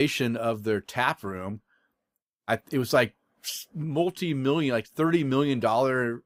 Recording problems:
abrupt cut into speech; at the start

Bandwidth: 15.5 kHz